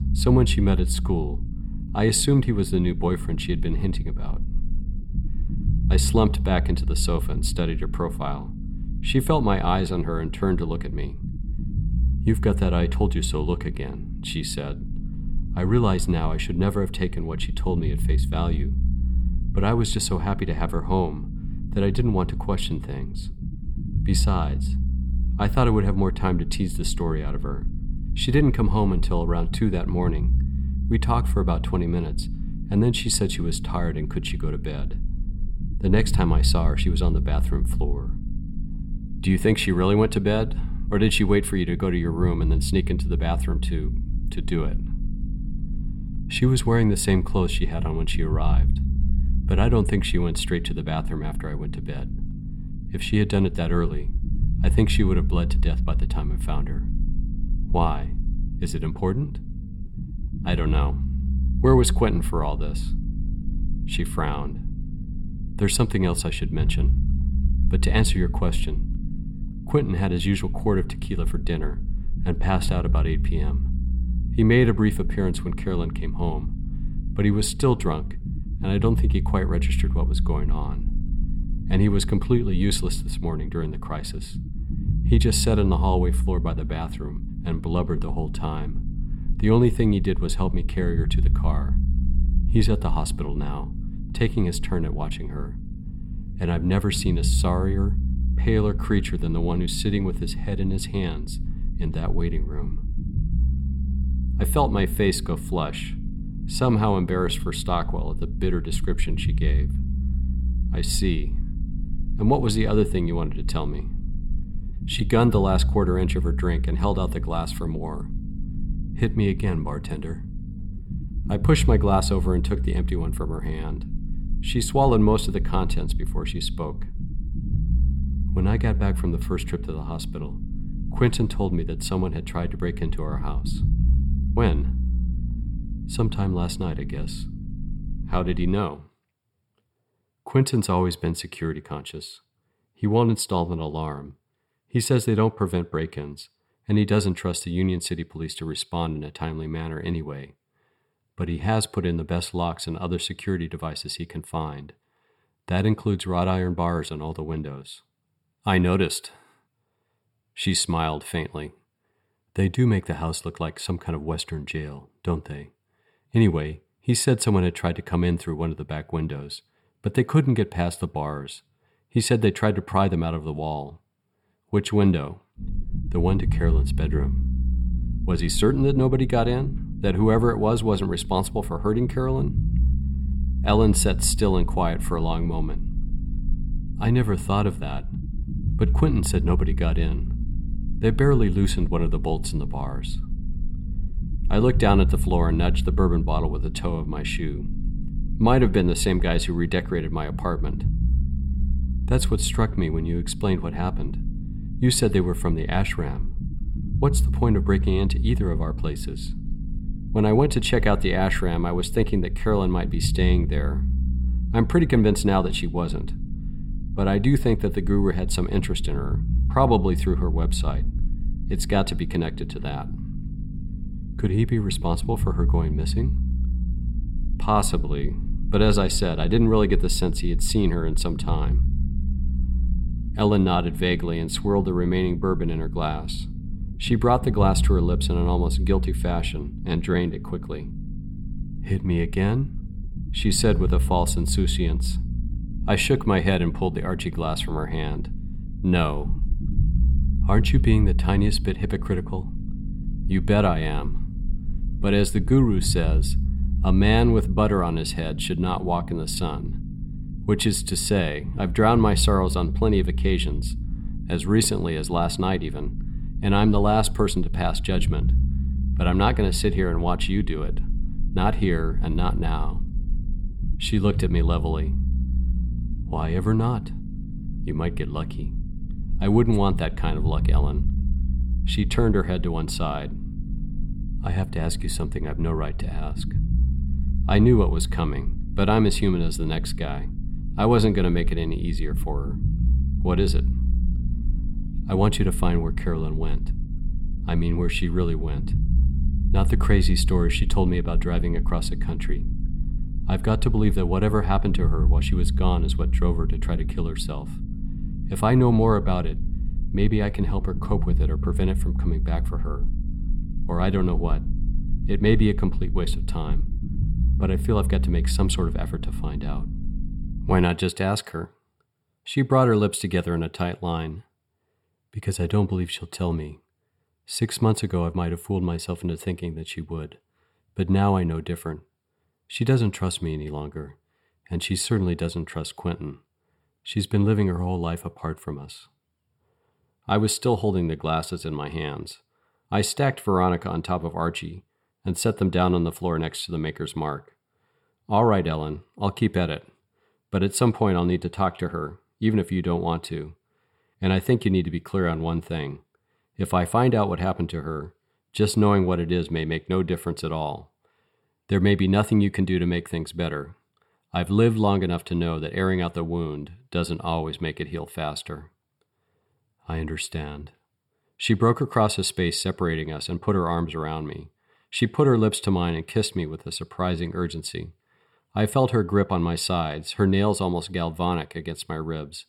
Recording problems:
low rumble; noticeable; until 2:19 and from 2:55 to 5:20; 15 dB below the speech

